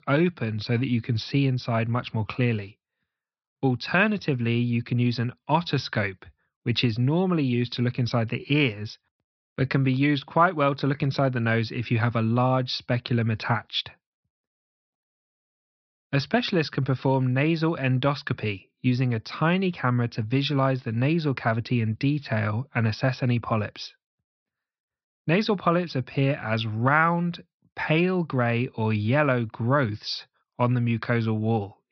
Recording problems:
high frequencies cut off; noticeable; nothing above 5.5 kHz

